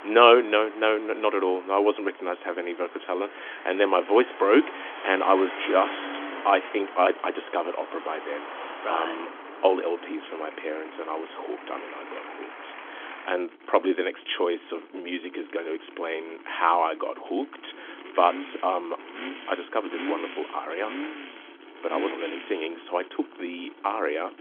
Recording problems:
phone-call audio; nothing above 3.5 kHz
traffic noise; noticeable; throughout; 15 dB below the speech

